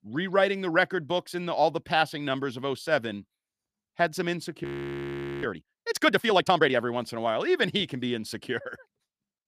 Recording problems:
audio freezing; at 4.5 s for 1 s

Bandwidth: 15 kHz